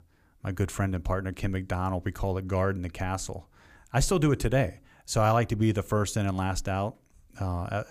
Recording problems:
none

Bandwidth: 15 kHz